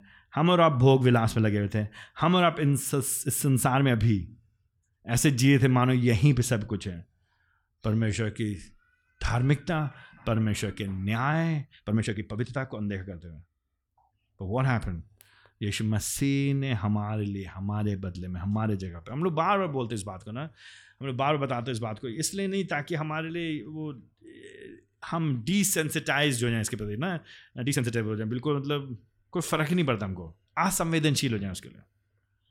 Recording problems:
uneven, jittery; strongly; from 3.5 to 30 s

